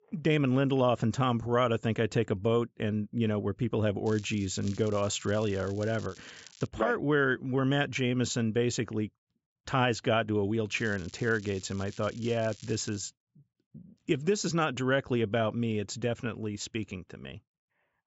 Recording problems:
high frequencies cut off; noticeable; nothing above 8 kHz
crackling; faint; from 4 to 6.5 s and from 11 to 13 s; 20 dB below the speech

